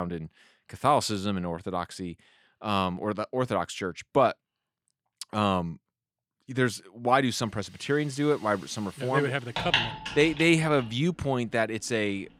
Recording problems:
household noises; loud; from 7.5 s on; 5 dB below the speech
abrupt cut into speech; at the start

